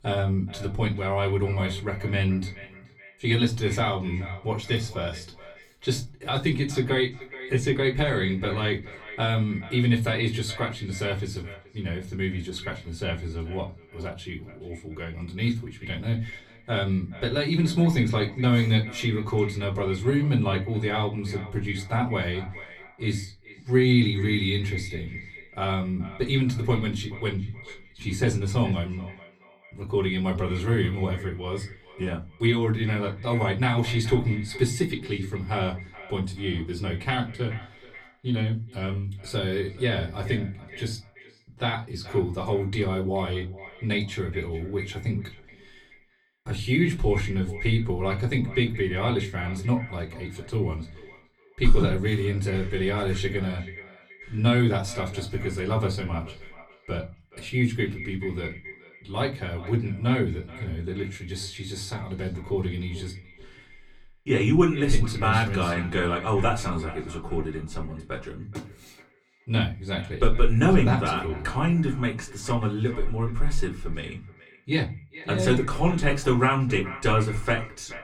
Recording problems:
off-mic speech; far
echo of what is said; noticeable; throughout; 430 ms later, 15 dB below the speech
room echo; very slight; dies away in 0.3 s

